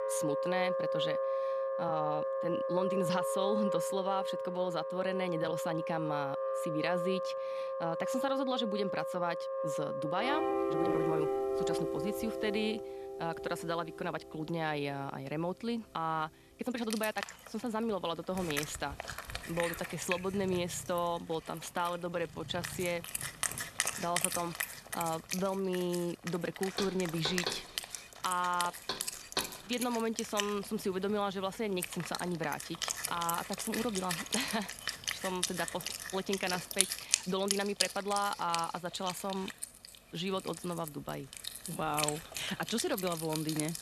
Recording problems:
background music; loud; throughout; 1 dB below the speech
uneven, jittery; strongly; from 1.5 to 43 s
door banging; noticeable; from 27 to 29 s; peak level with the speech

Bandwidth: 13.5 kHz